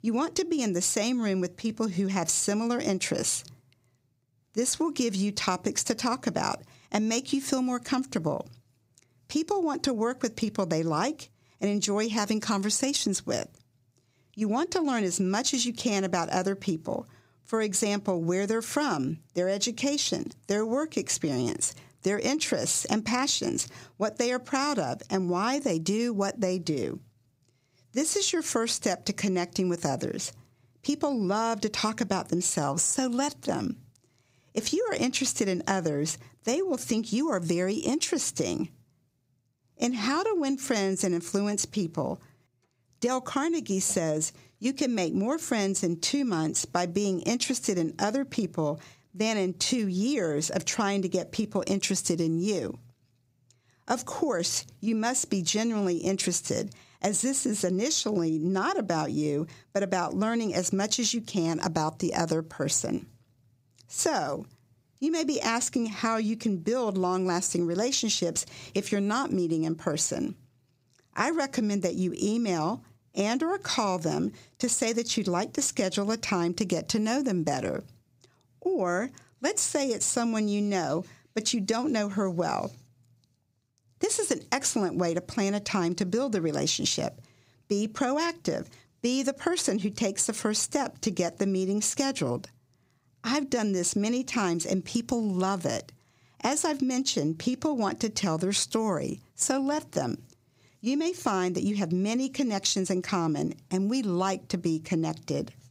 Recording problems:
squashed, flat; somewhat

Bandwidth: 15.5 kHz